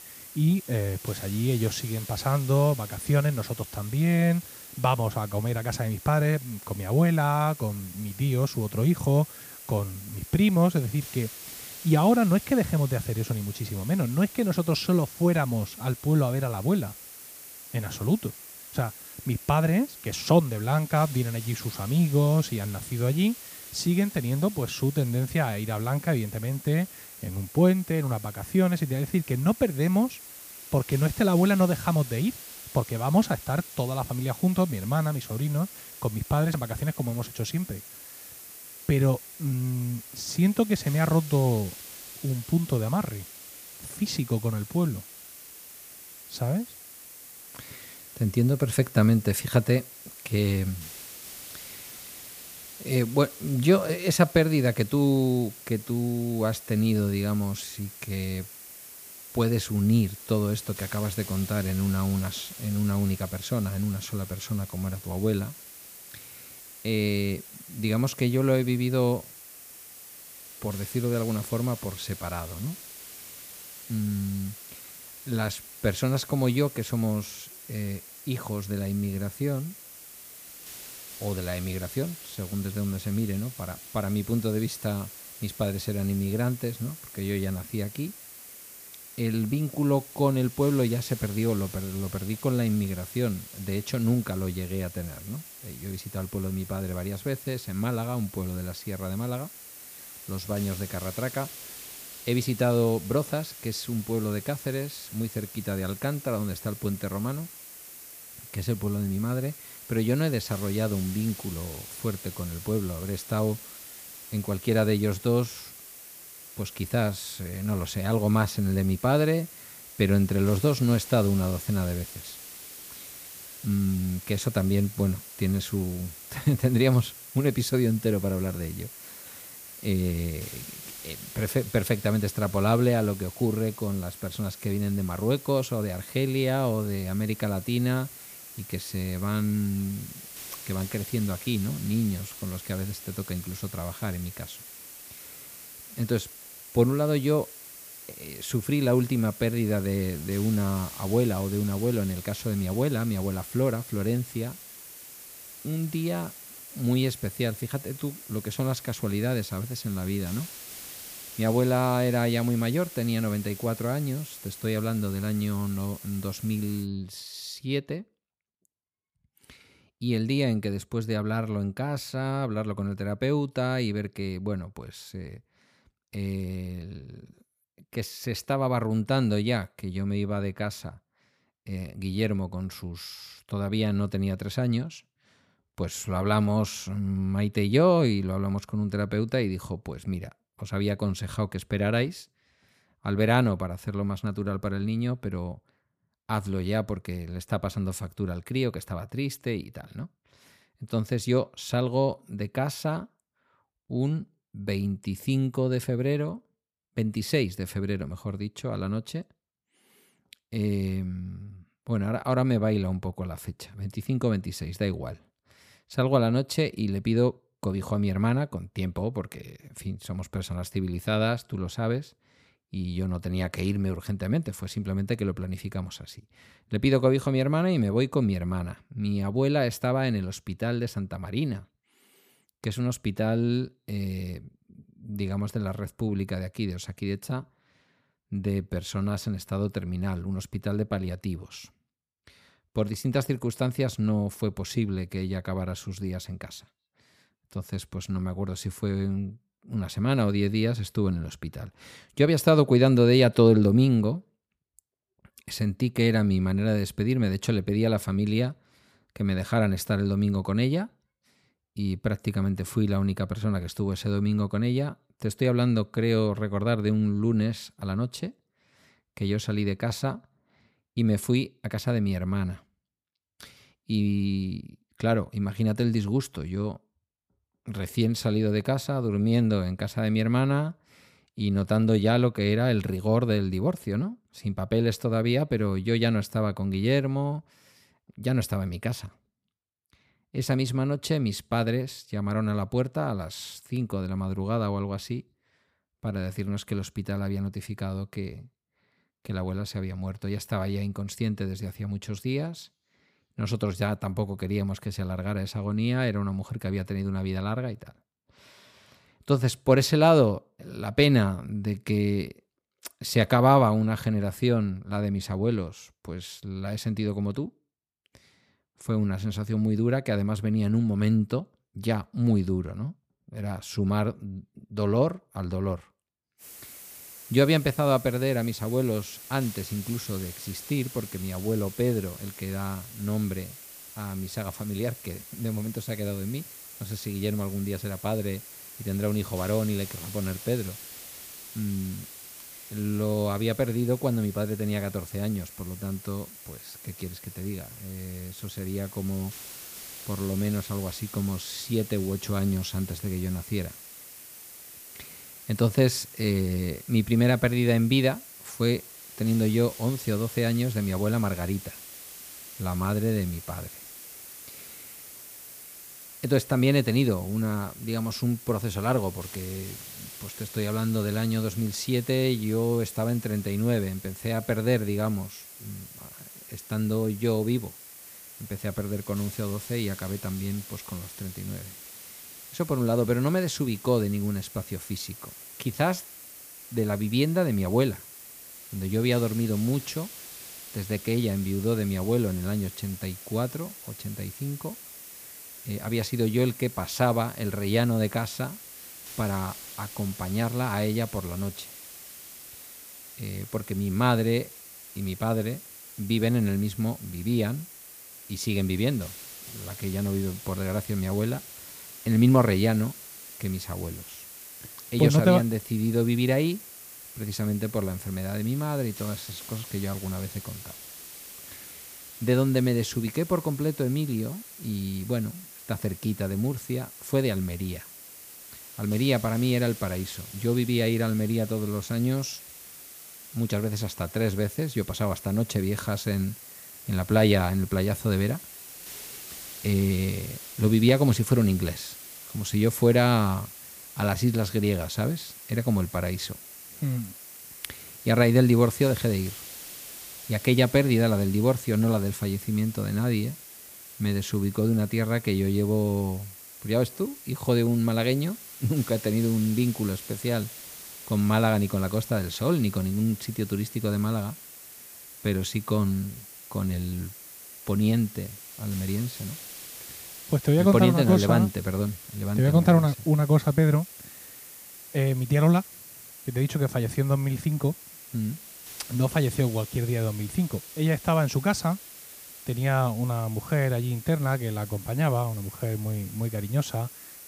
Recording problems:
hiss; noticeable; until 2:47 and from 5:26 on; 15 dB below the speech

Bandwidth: 15 kHz